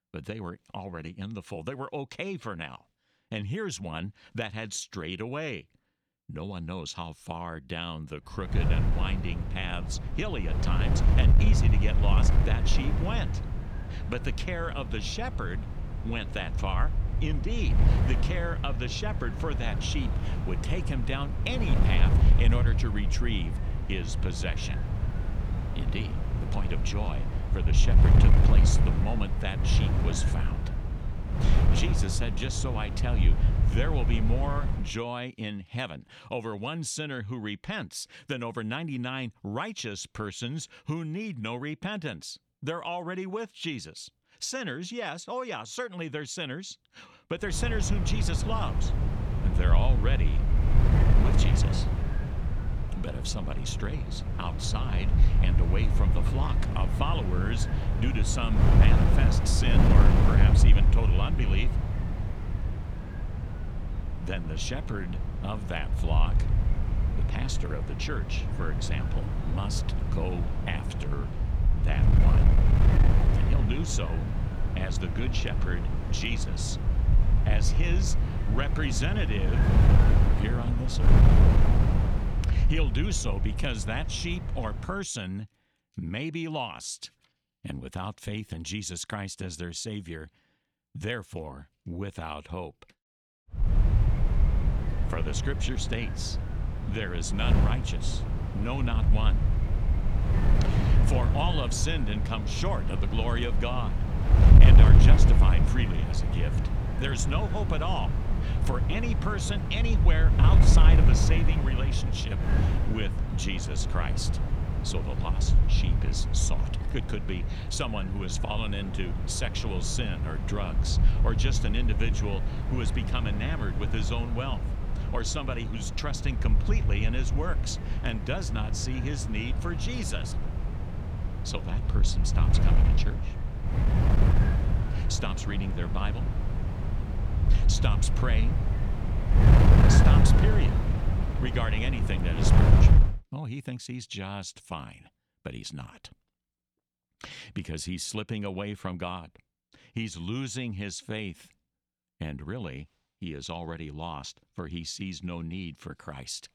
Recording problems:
wind noise on the microphone; heavy; from 8.5 to 35 s, from 48 s to 1:25 and from 1:34 to 2:23; 3 dB below the speech

